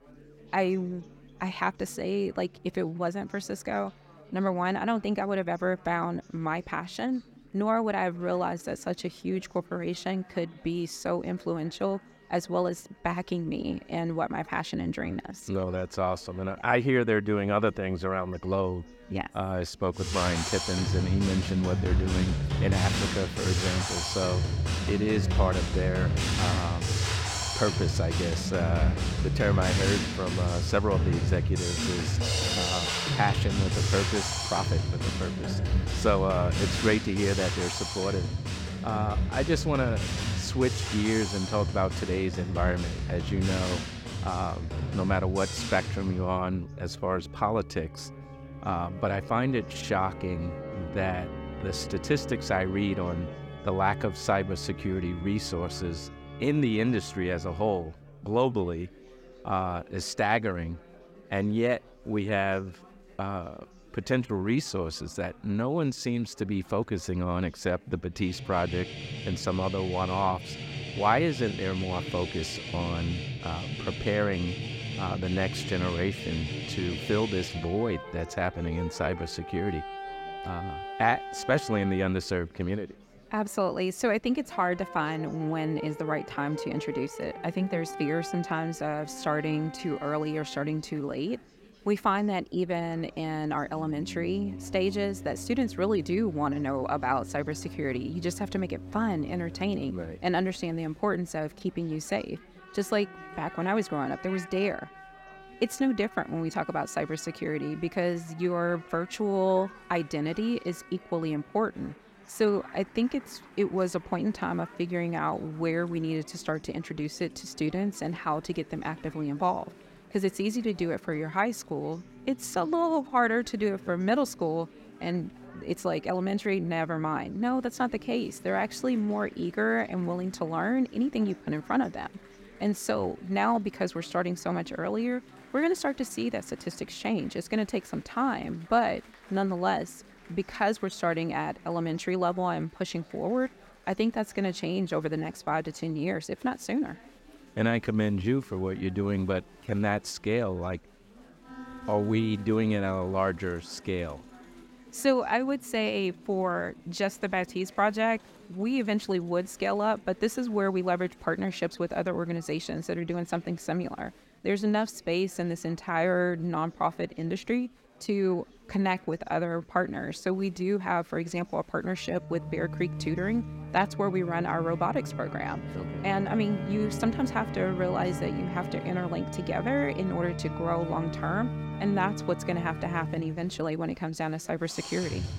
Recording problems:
background music; loud; throughout; 3 dB below the speech
chatter from many people; faint; throughout; 25 dB below the speech

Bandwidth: 16 kHz